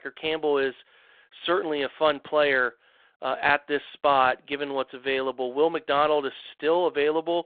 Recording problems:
phone-call audio; nothing above 3.5 kHz

